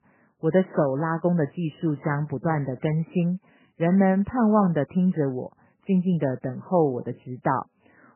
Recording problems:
garbled, watery; badly; nothing above 3 kHz

